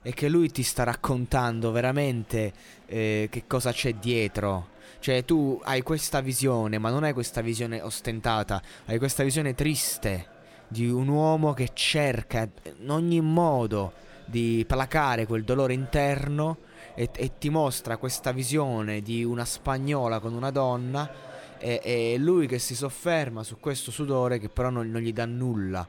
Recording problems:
murmuring crowd; faint; throughout; 25 dB below the speech

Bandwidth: 17.5 kHz